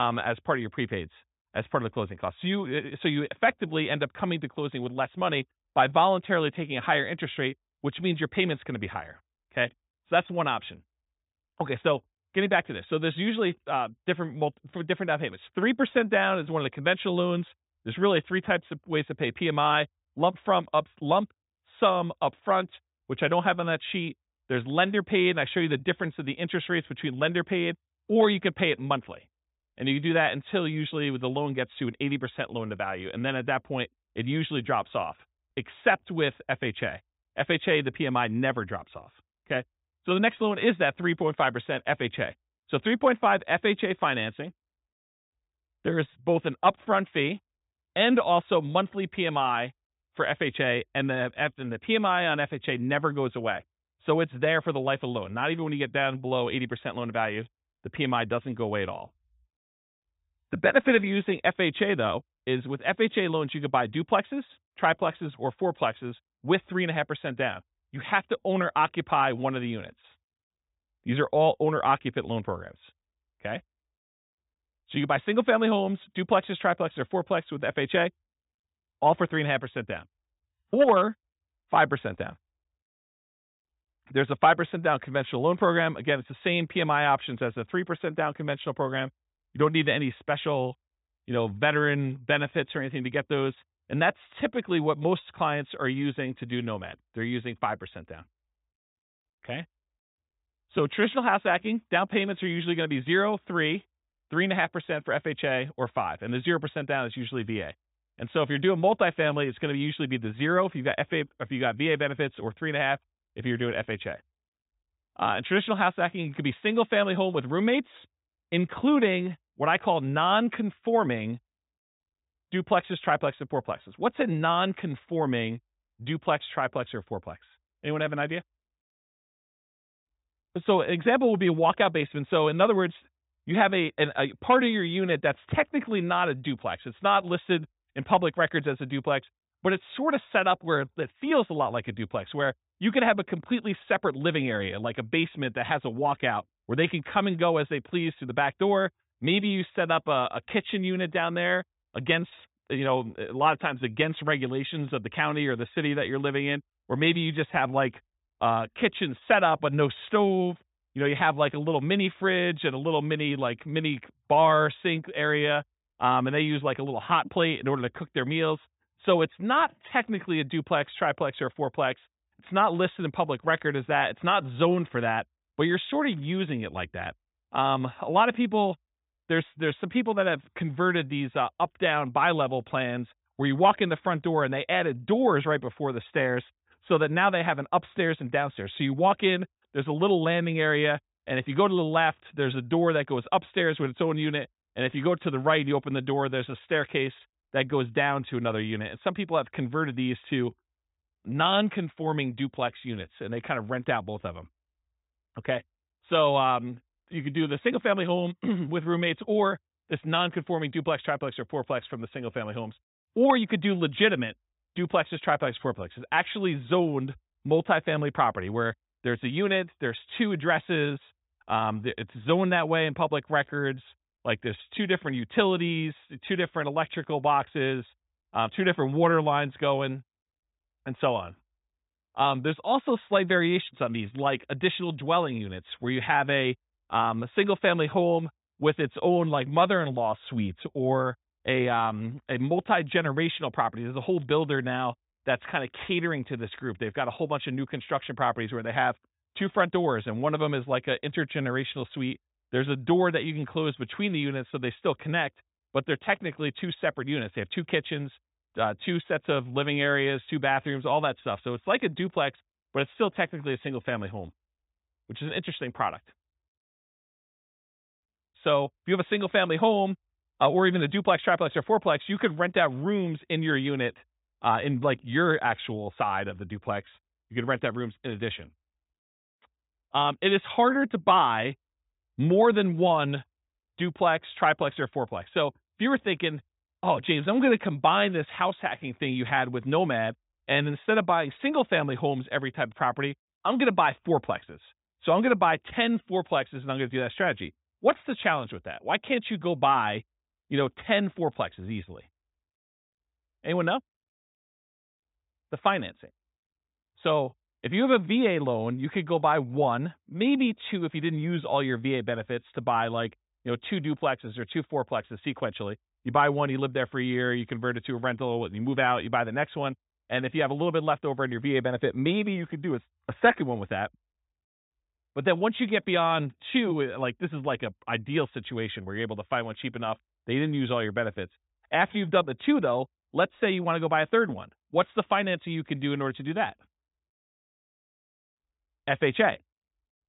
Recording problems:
high frequencies cut off; severe; nothing above 4 kHz
abrupt cut into speech; at the start

